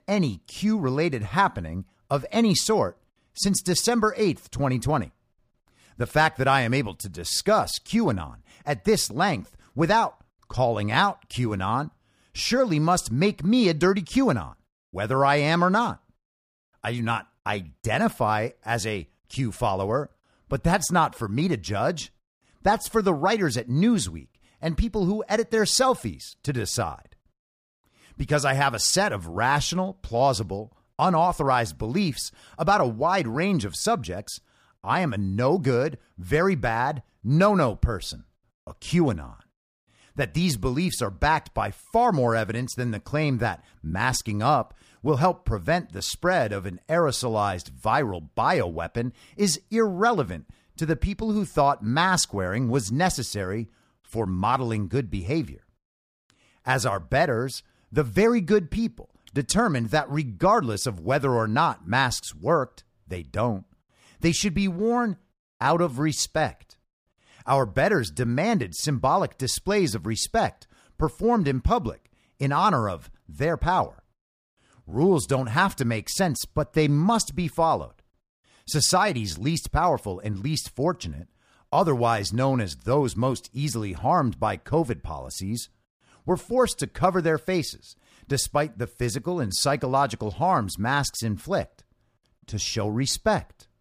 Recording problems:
none

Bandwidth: 15 kHz